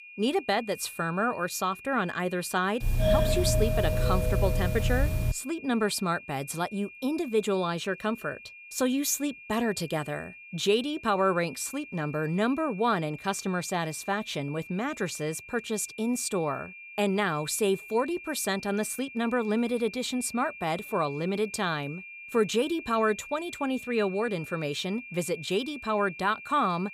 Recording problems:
high-pitched whine; noticeable; throughout; 2.5 kHz, 15 dB below the speech
doorbell; loud; from 3 to 5.5 s; peak 4 dB above the speech

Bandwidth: 15 kHz